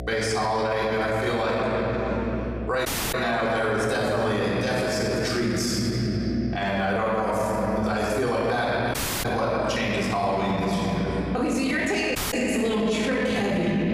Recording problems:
room echo; strong; dies away in 3 s
off-mic speech; far
echo of what is said; faint; throughout; 90 ms later, 20 dB below the speech
squashed, flat; somewhat
electrical hum; faint; throughout; 60 Hz, 25 dB below the speech
audio cutting out; at 3 s, at 9 s and at 12 s

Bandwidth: 15 kHz